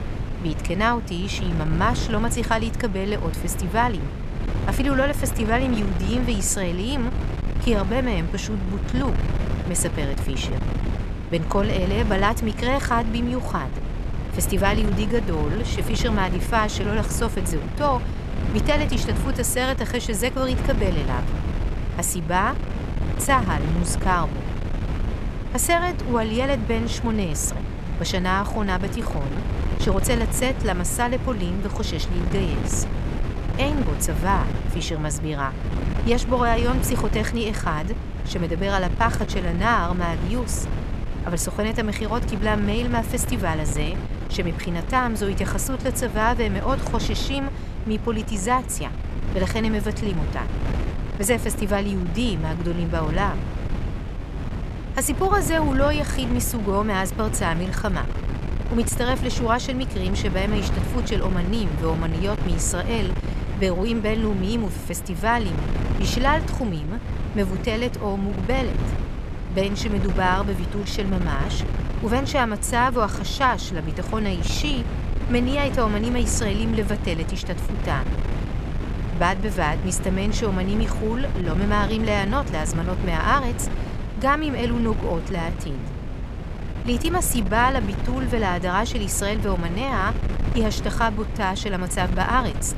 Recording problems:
wind noise on the microphone; occasional gusts; 10 dB below the speech

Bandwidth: 13.5 kHz